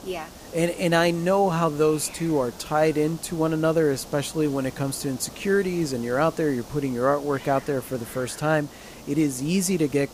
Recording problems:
hiss; noticeable; throughout; 20 dB below the speech

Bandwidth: 15 kHz